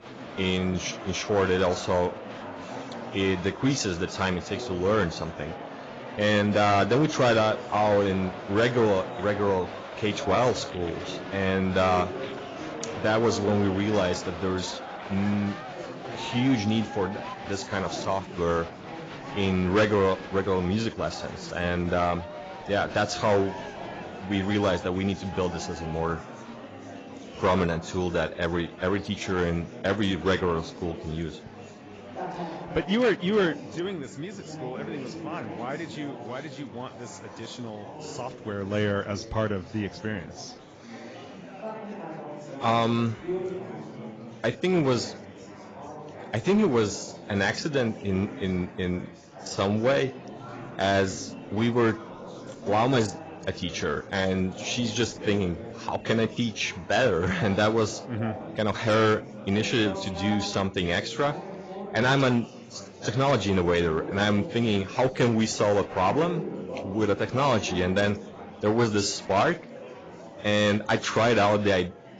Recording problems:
garbled, watery; badly; nothing above 7.5 kHz
distortion; slight; 3% of the sound clipped
murmuring crowd; noticeable; throughout; 15 dB below the speech

